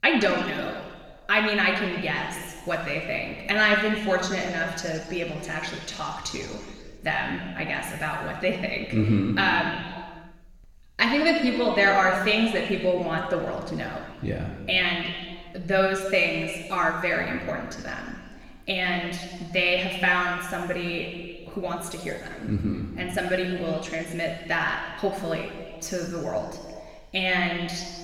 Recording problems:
room echo; noticeable; dies away in 1.6 s
off-mic speech; somewhat distant

